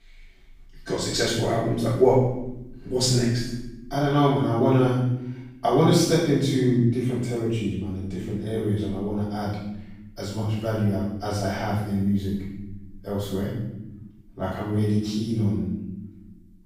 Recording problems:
room echo; strong; dies away in 0.9 s
off-mic speech; far

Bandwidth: 15.5 kHz